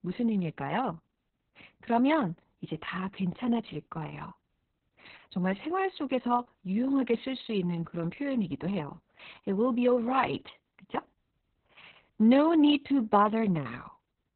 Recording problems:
garbled, watery; badly; nothing above 4 kHz

